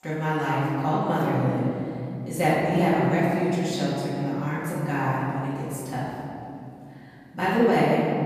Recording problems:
room echo; strong; dies away in 2.9 s
off-mic speech; far

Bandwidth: 14.5 kHz